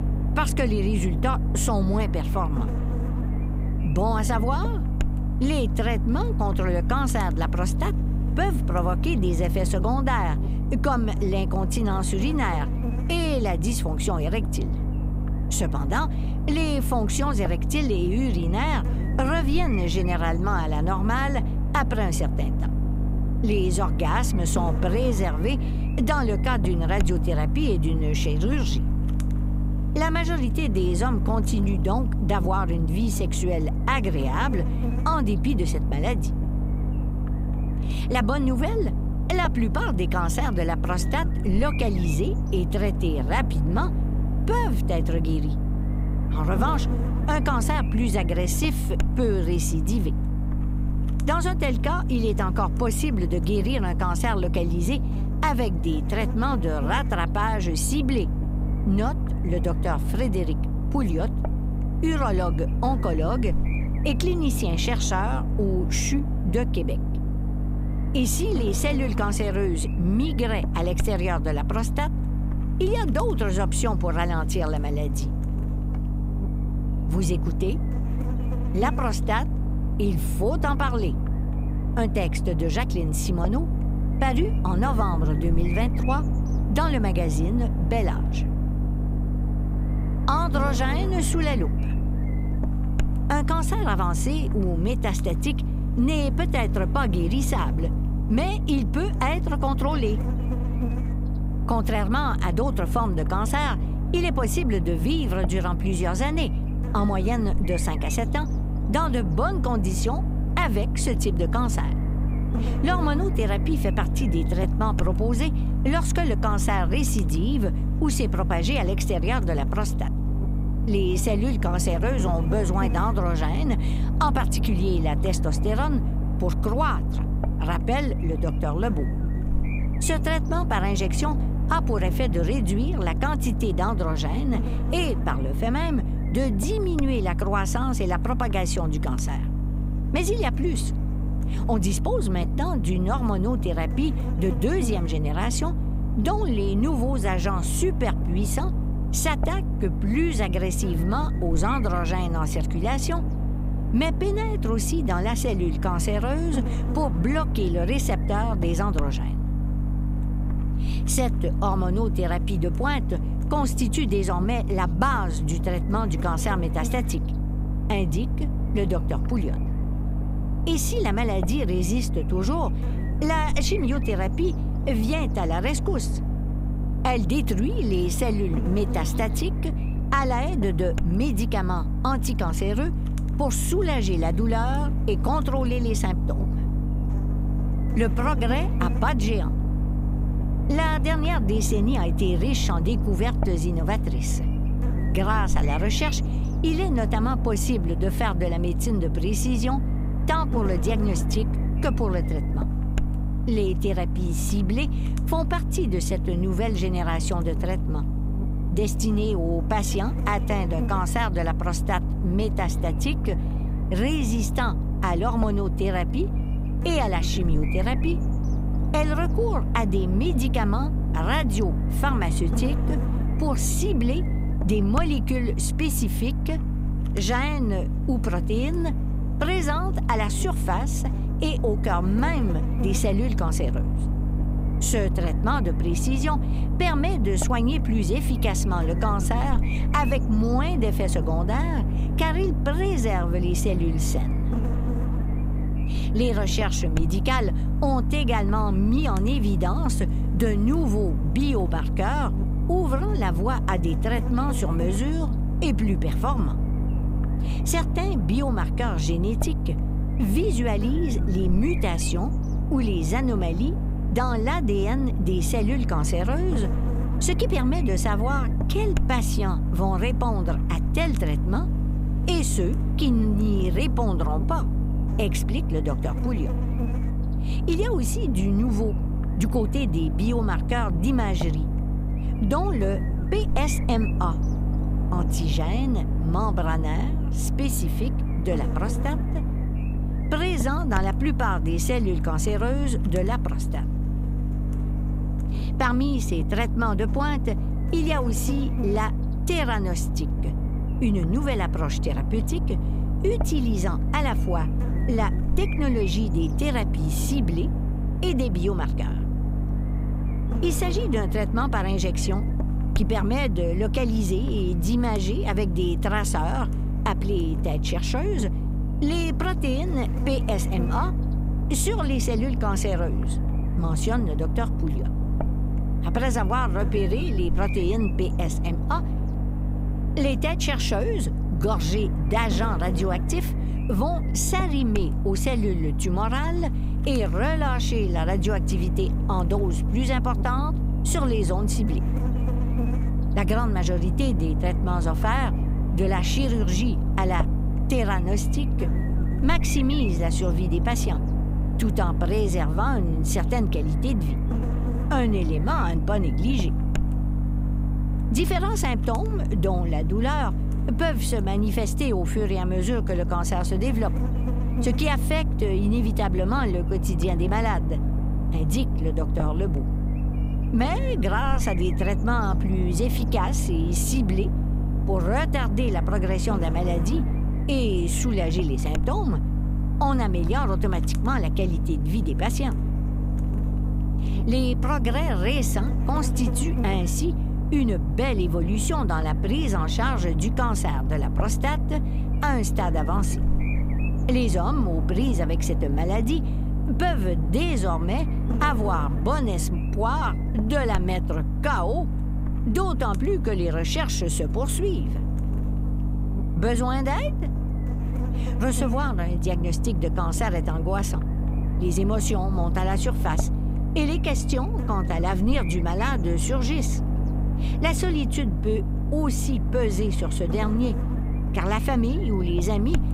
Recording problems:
electrical hum; loud; throughout; 50 Hz, 9 dB below the speech

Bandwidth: 15.5 kHz